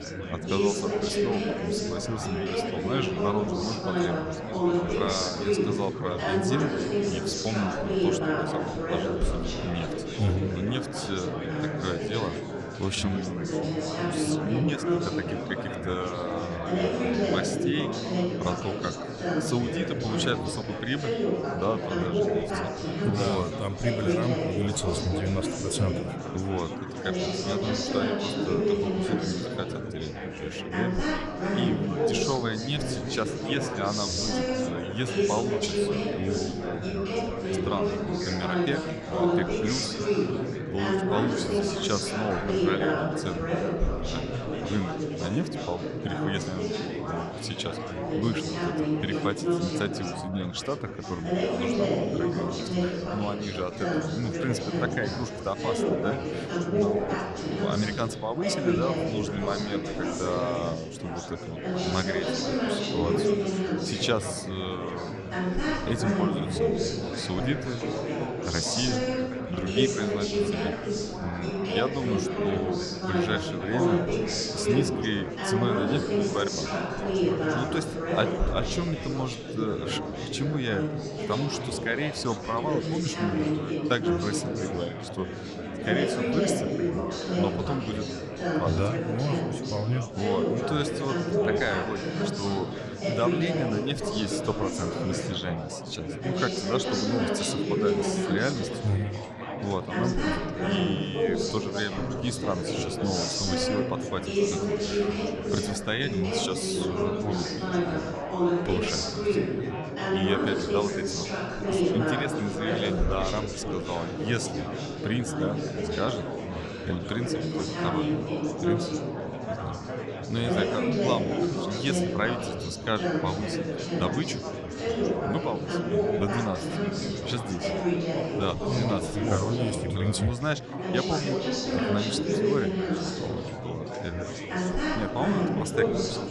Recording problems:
chatter from many people; very loud; throughout; 3 dB above the speech

